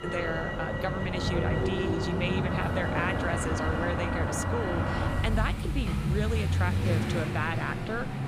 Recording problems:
traffic noise; very loud; throughout; 4 dB above the speech

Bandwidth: 15.5 kHz